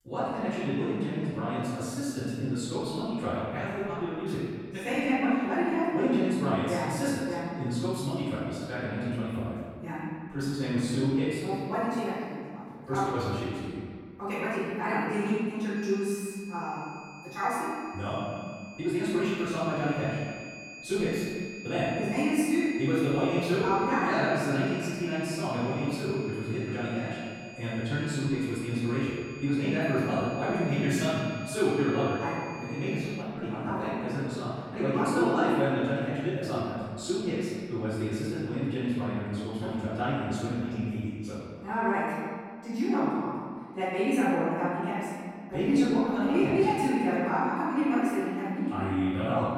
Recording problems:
room echo; strong; dies away in 1.7 s
off-mic speech; far
wrong speed, natural pitch; too fast; 1.5 times normal speed
high-pitched whine; noticeable; from 16 to 33 s; 2.5 kHz, 15 dB below the speech

